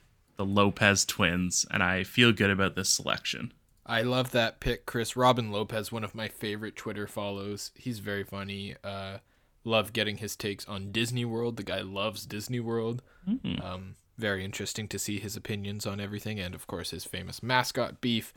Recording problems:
none

